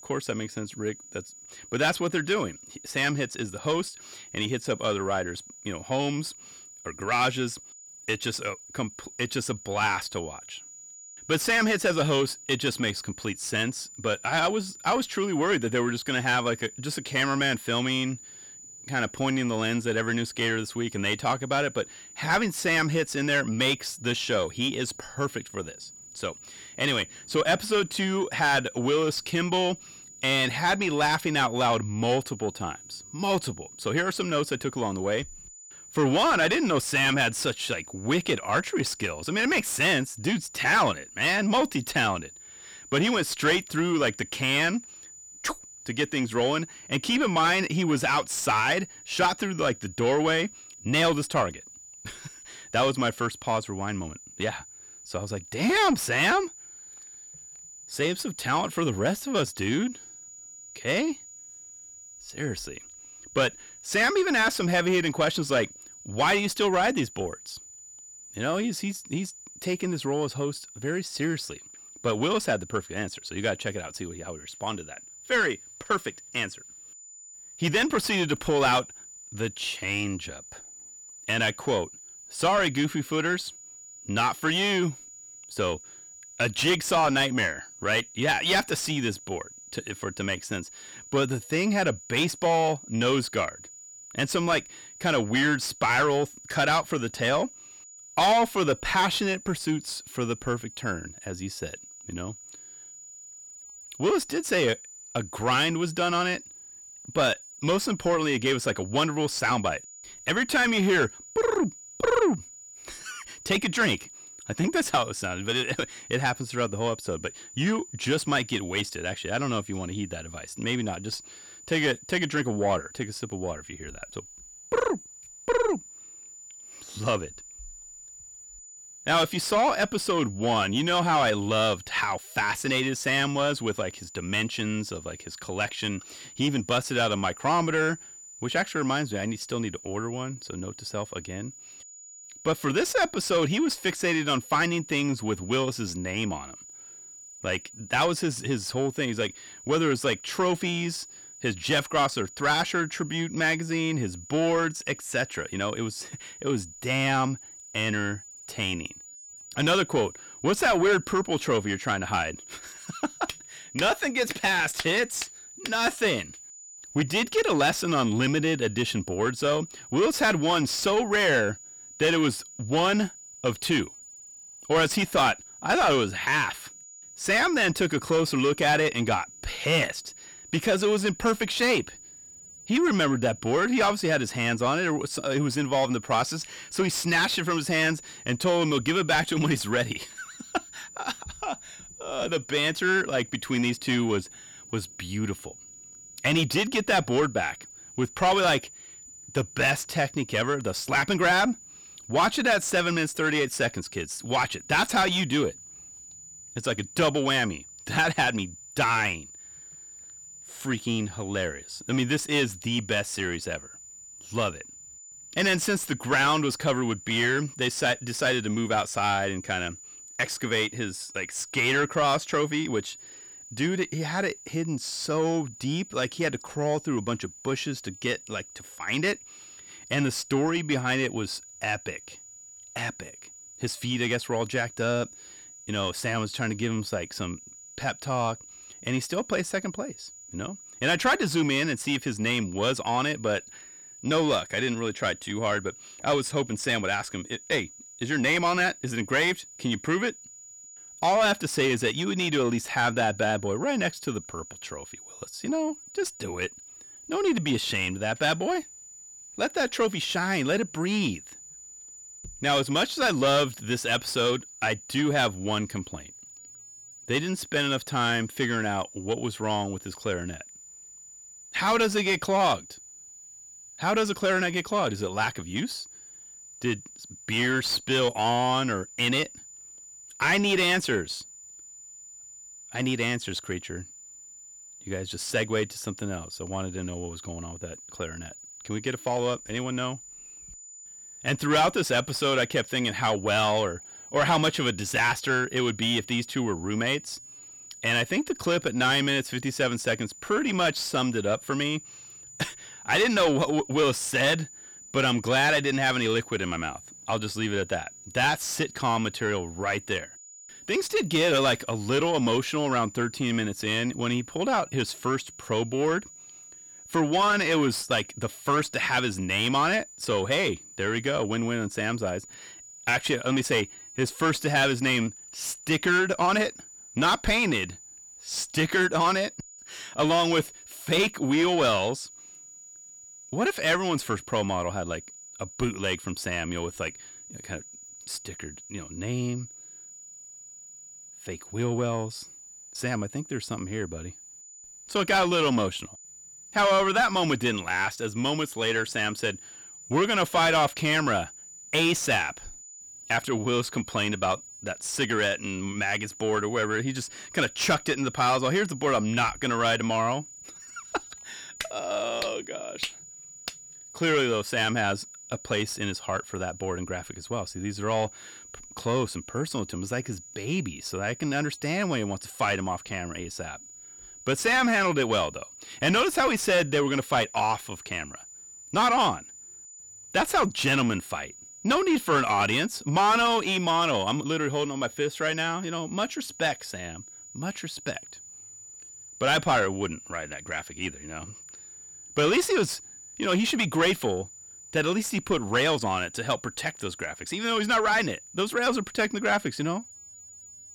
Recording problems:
distortion; heavy; 7 dB below the speech
high-pitched whine; noticeable; throughout; 7 kHz, 15 dB below the speech

